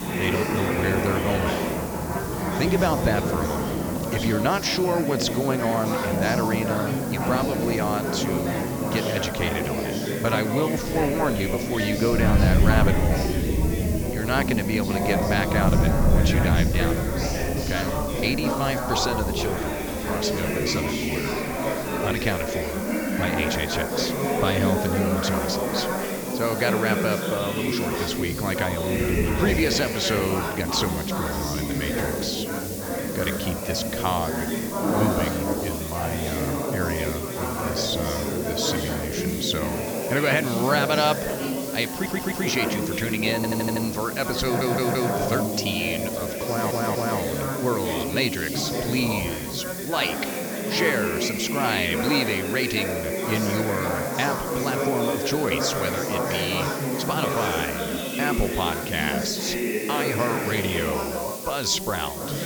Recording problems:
high frequencies cut off; noticeable; nothing above 8 kHz
rain or running water; loud; throughout; 3 dB below the speech
chatter from many people; loud; throughout; 1 dB below the speech
hiss; loud; throughout; 8 dB below the speech
audio stuttering; 4 times, first at 42 s

